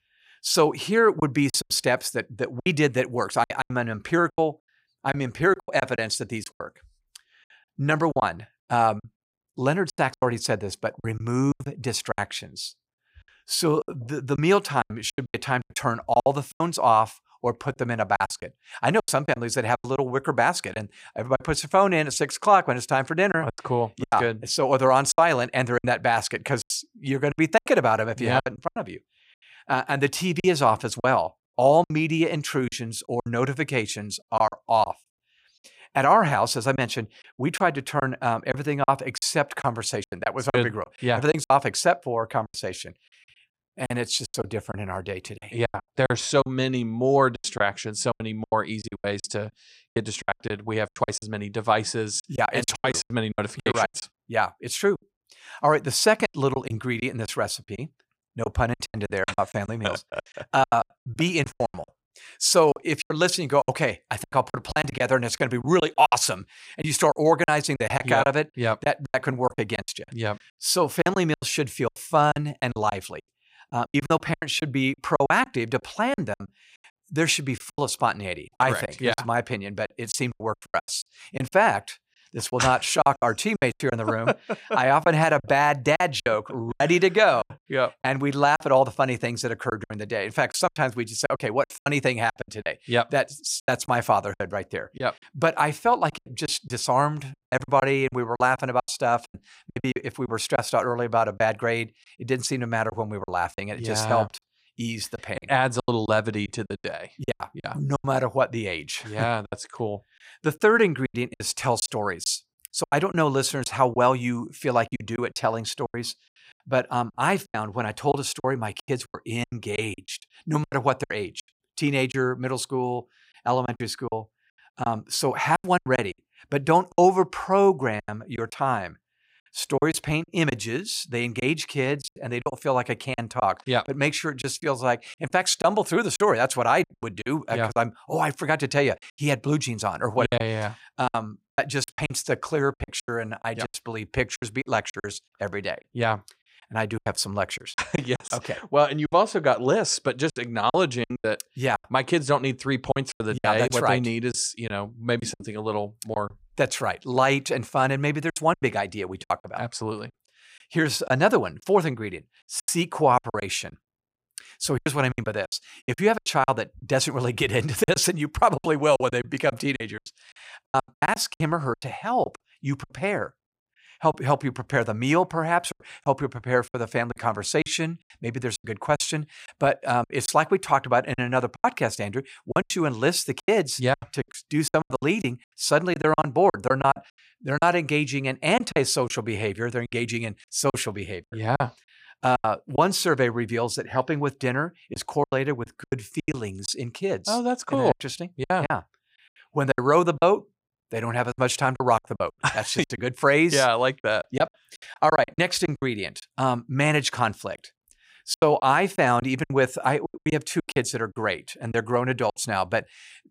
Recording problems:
choppy; very; 12% of the speech affected

